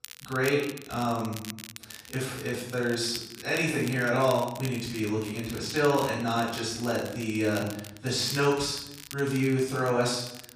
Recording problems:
off-mic speech; far
room echo; noticeable; dies away in 0.7 s
crackle, like an old record; noticeable; 15 dB below the speech

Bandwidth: 15 kHz